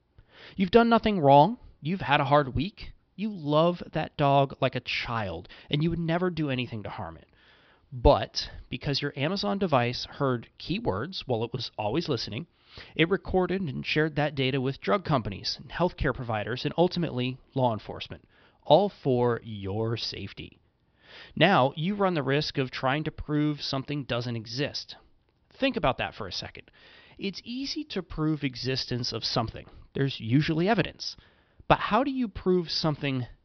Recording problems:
high frequencies cut off; noticeable; nothing above 5.5 kHz

